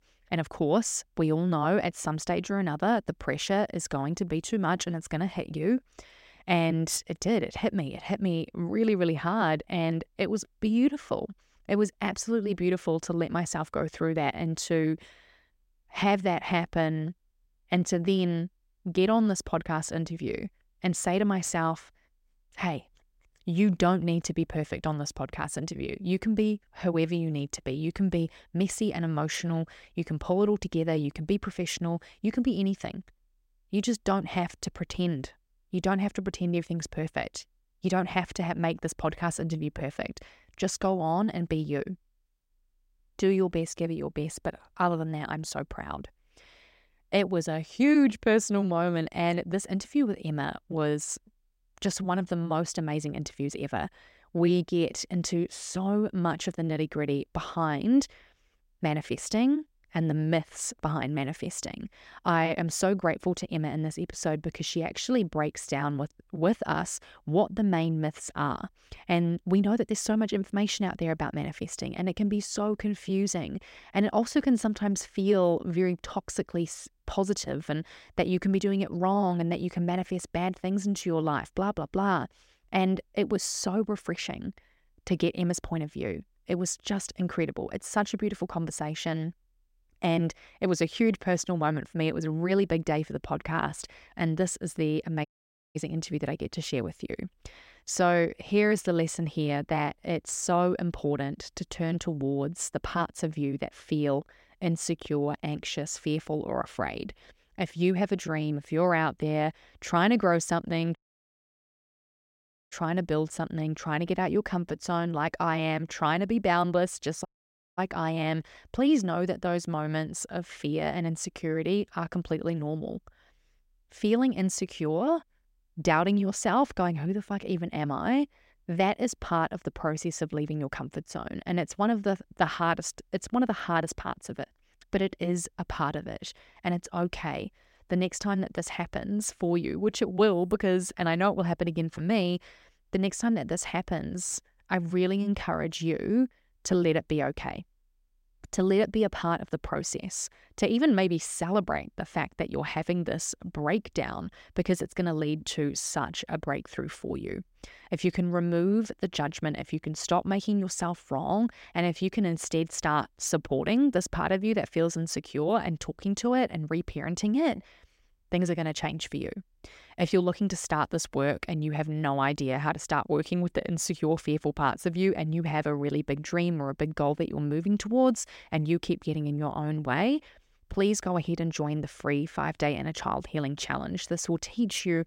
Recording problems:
audio cutting out; at 1:35 for 0.5 s, at 1:51 for 2 s and at 1:57 for 0.5 s

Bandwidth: 16 kHz